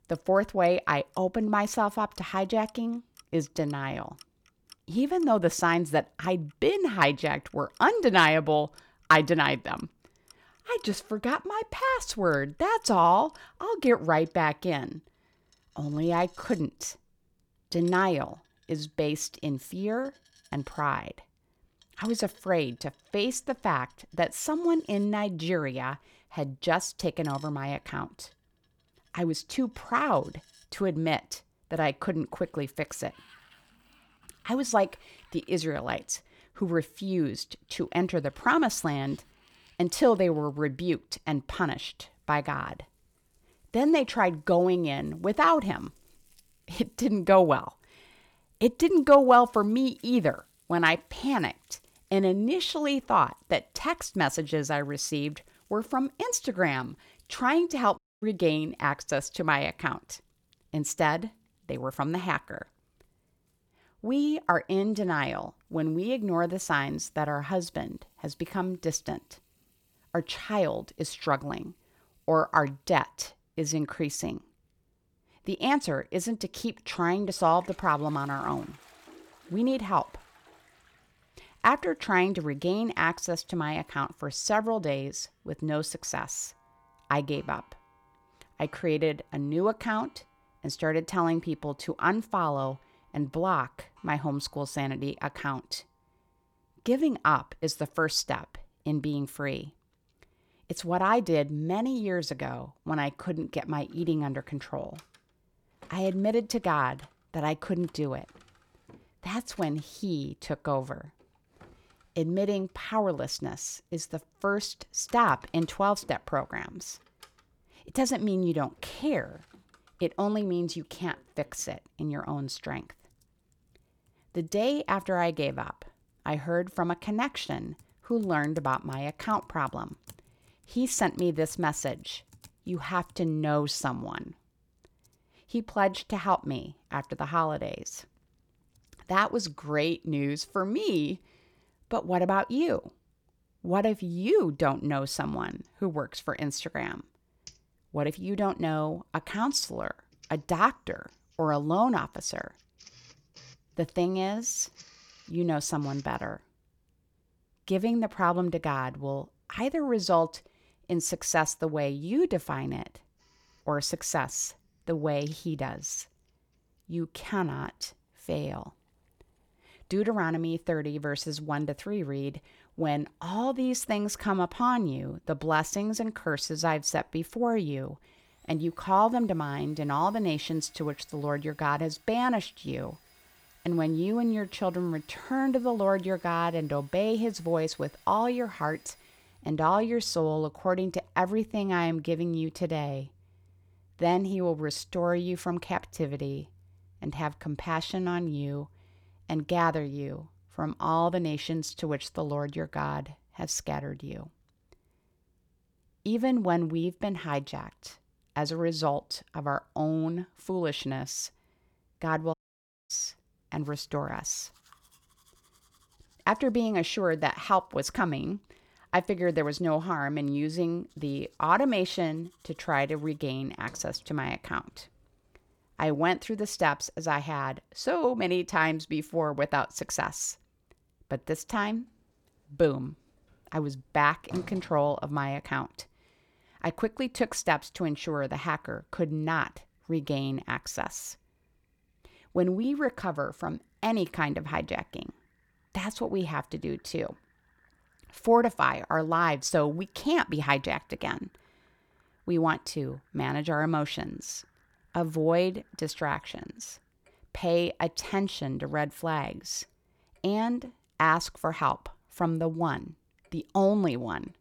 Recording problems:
household noises; faint; throughout; 30 dB below the speech
audio cutting out; at 58 s and at 3:32 for 0.5 s

